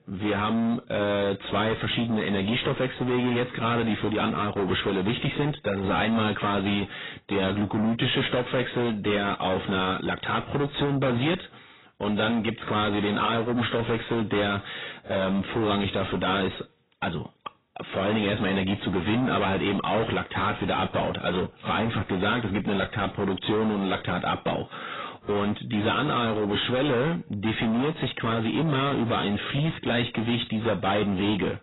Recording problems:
distortion; heavy; 6 dB below the speech
garbled, watery; badly; nothing above 4 kHz

